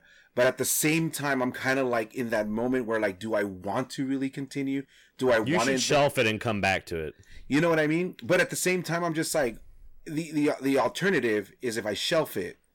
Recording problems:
distortion; slight; 10 dB below the speech

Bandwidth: 17.5 kHz